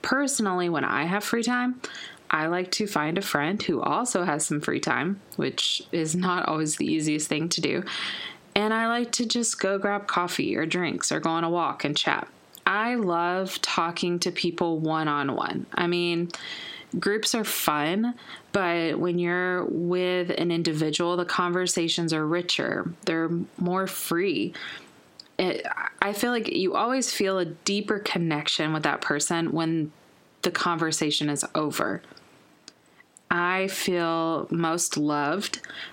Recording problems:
squashed, flat; heavily

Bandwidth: 16 kHz